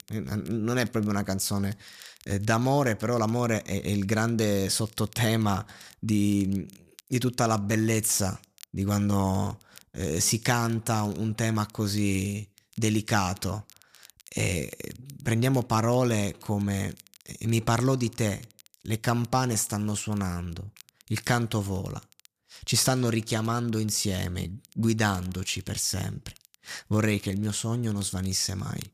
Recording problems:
crackle, like an old record; faint; 25 dB below the speech

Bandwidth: 14.5 kHz